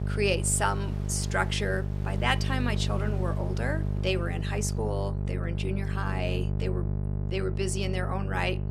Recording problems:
electrical hum; noticeable; throughout; 50 Hz, 10 dB below the speech
rain or running water; faint; throughout; 20 dB below the speech

